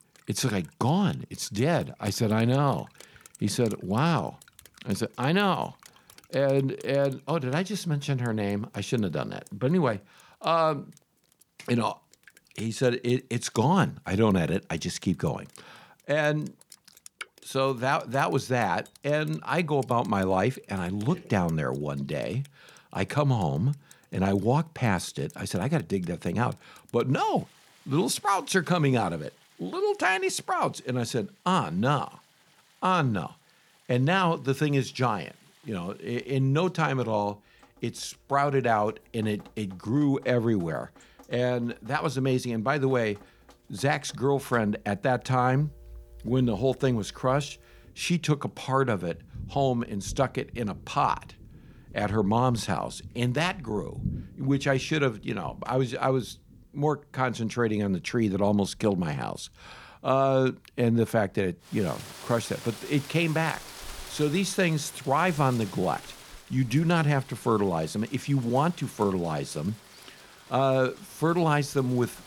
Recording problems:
rain or running water; faint; throughout; 20 dB below the speech

